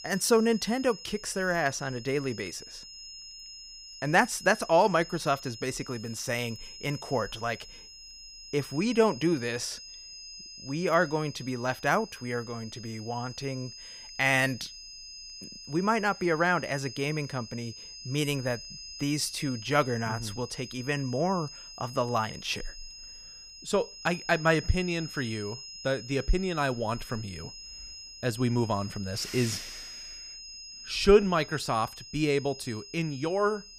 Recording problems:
high-pitched whine; noticeable; throughout; 5 kHz, 15 dB below the speech

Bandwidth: 15.5 kHz